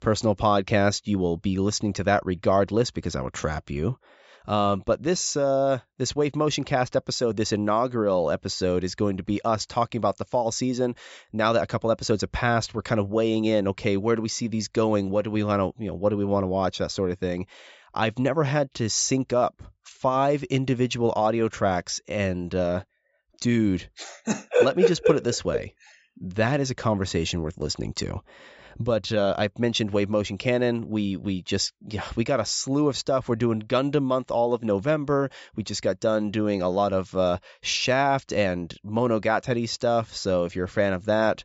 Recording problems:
high frequencies cut off; noticeable; nothing above 8 kHz

